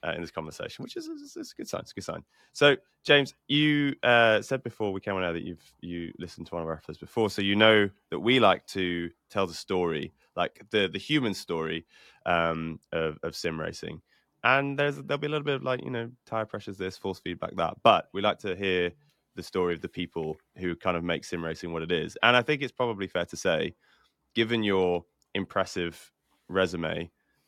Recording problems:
none

